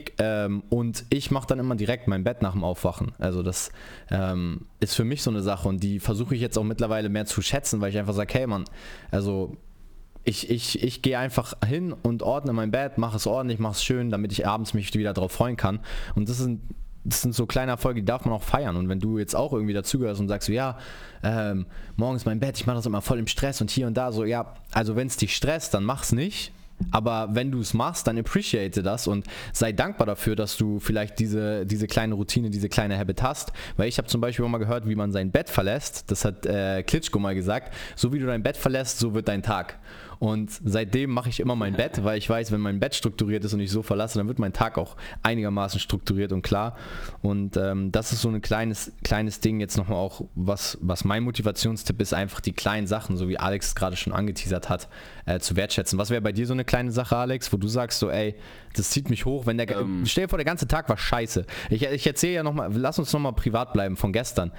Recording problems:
squashed, flat; heavily

